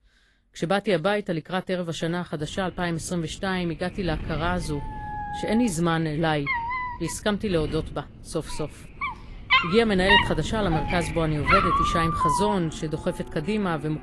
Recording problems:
garbled, watery; slightly; nothing above 11.5 kHz
animal sounds; very loud; from 5 s on; 2 dB above the speech
wind noise on the microphone; occasional gusts; from 2.5 s on; 15 dB below the speech

